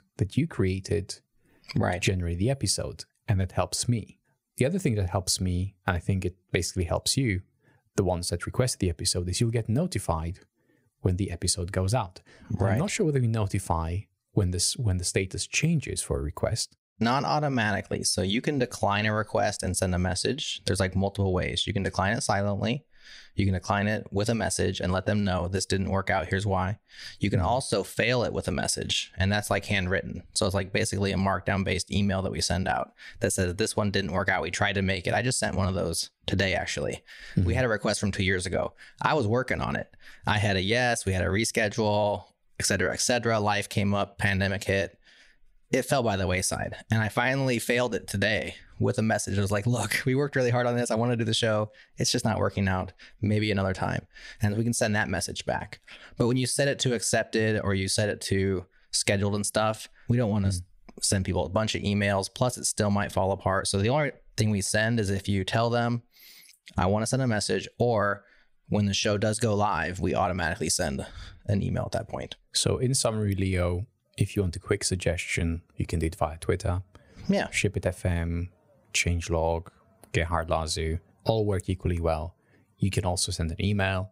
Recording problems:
squashed, flat; somewhat

